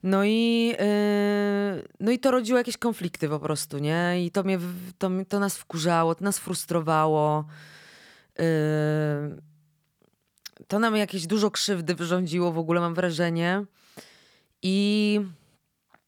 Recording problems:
none

